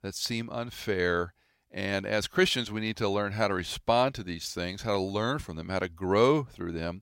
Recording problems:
none

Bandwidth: 16 kHz